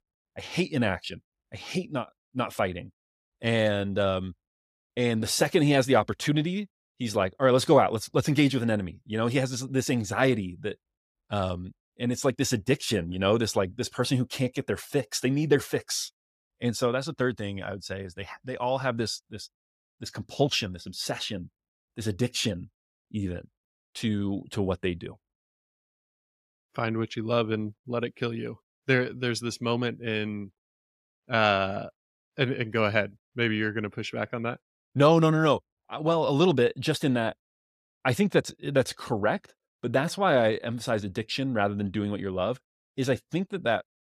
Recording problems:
none

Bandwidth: 14.5 kHz